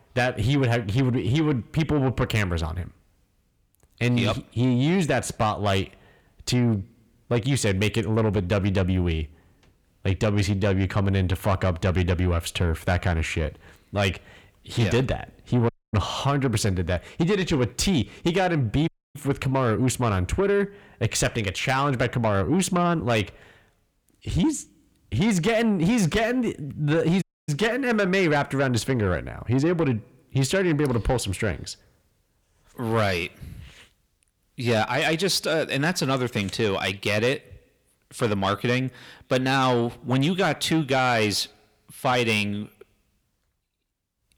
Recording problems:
distortion; slight; 10 dB below the speech
audio cutting out; at 16 s, at 19 s and at 27 s

